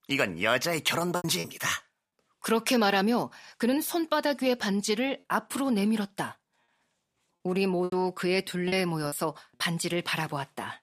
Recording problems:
choppy; occasionally; at 1 s, at 8 s and at 8.5 s; 5% of the speech affected

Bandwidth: 15 kHz